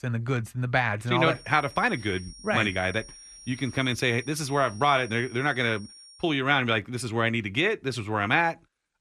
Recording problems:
high-pitched whine; noticeable; from 1.5 to 6 s; 5.5 kHz, 20 dB below the speech

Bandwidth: 13.5 kHz